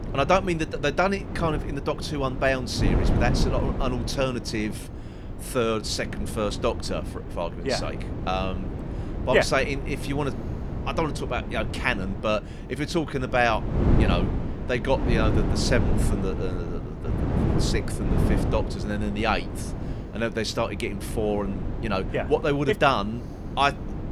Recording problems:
wind noise on the microphone; heavy; 10 dB below the speech

